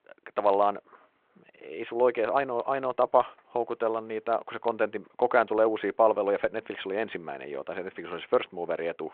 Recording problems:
phone-call audio; nothing above 3.5 kHz

